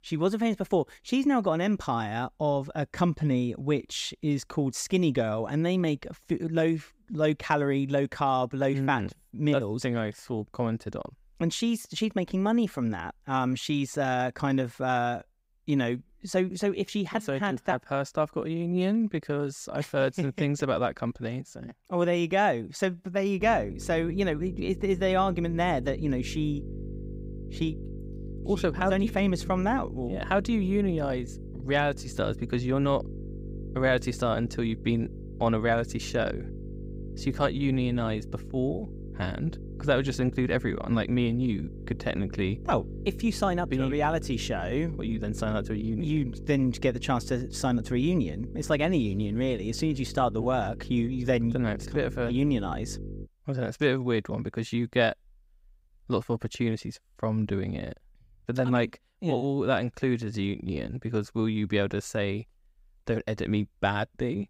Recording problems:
electrical hum; noticeable; from 23 to 53 s; 50 Hz, 20 dB below the speech

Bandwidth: 15.5 kHz